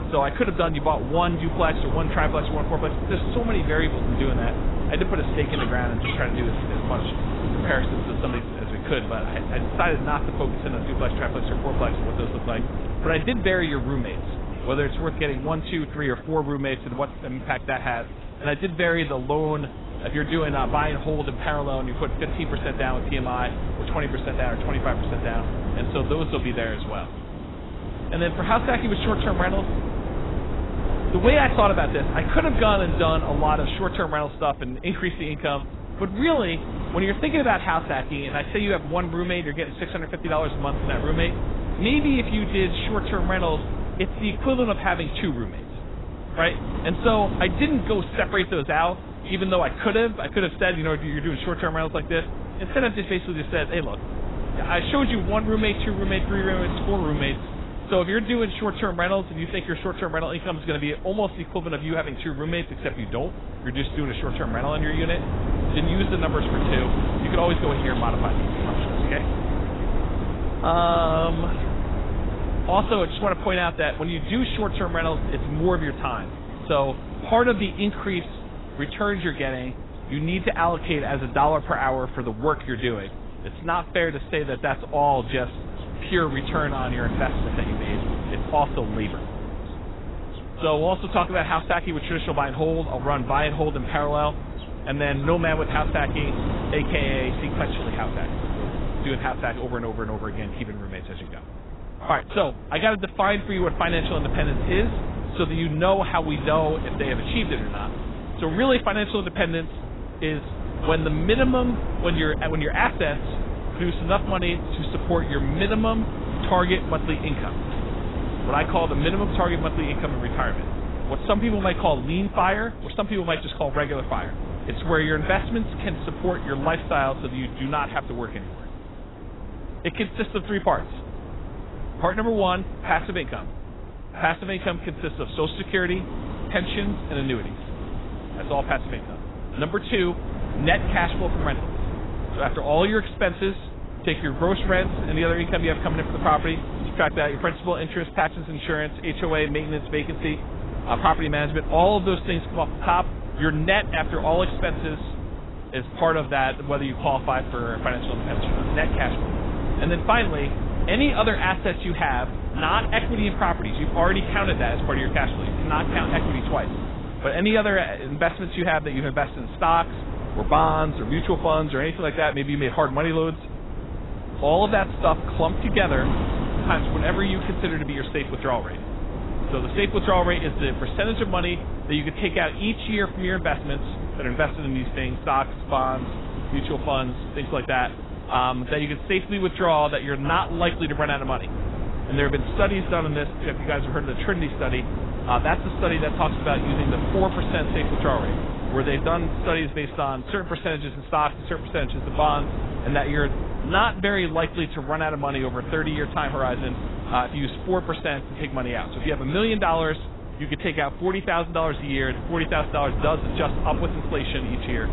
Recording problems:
garbled, watery; badly; nothing above 4 kHz
wind noise on the microphone; occasional gusts; 10 dB below the speech
animal sounds; faint; until 1:37; 25 dB below the speech

